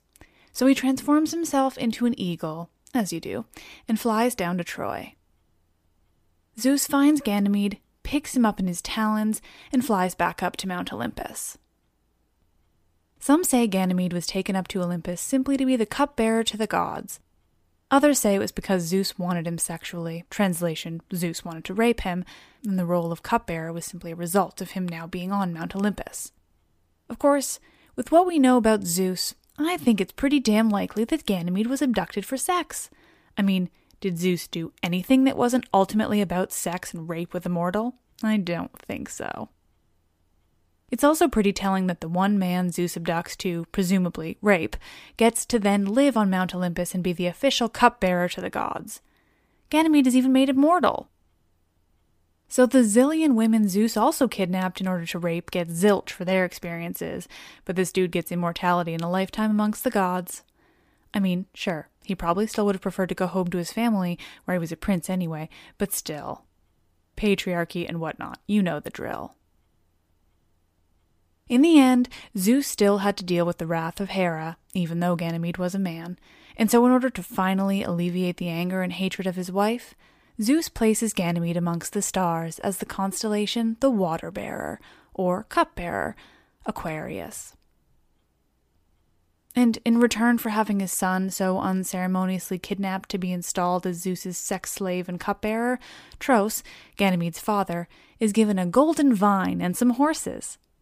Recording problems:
none

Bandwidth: 15 kHz